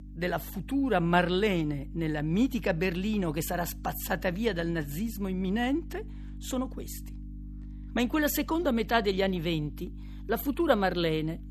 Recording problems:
electrical hum; faint; throughout; 50 Hz, 25 dB below the speech

